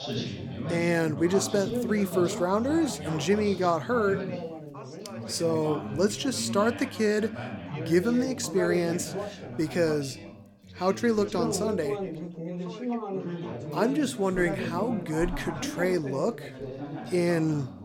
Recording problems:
background chatter; loud; throughout; 3 voices, 8 dB below the speech

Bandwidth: 17.5 kHz